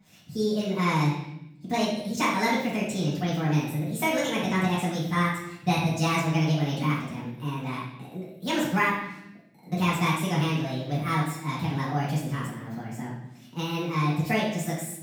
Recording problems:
off-mic speech; far
wrong speed and pitch; too fast and too high; 1.5 times normal speed
room echo; noticeable; dies away in 0.8 s

